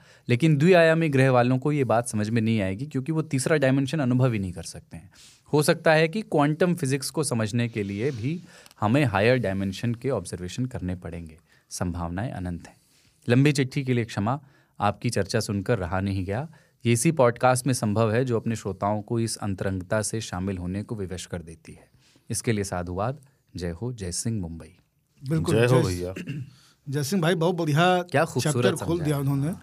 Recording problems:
none

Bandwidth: 15 kHz